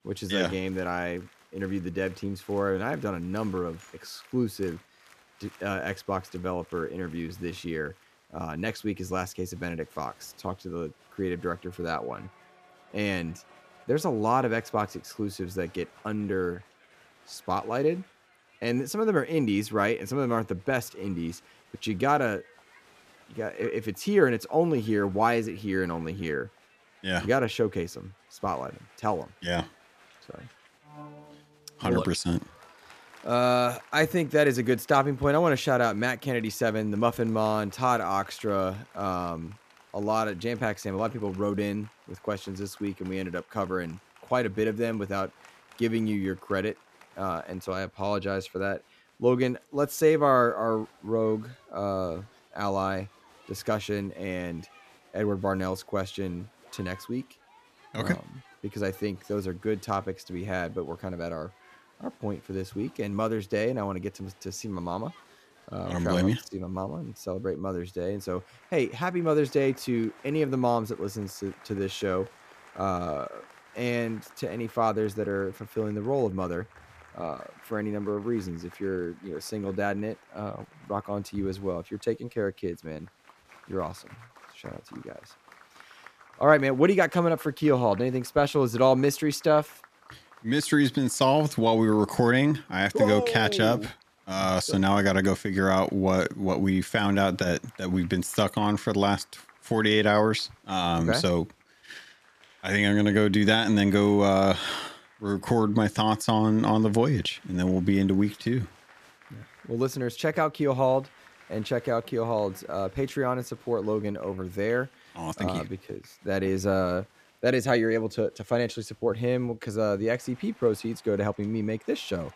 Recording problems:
crowd noise; faint; throughout; 25 dB below the speech

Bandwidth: 14.5 kHz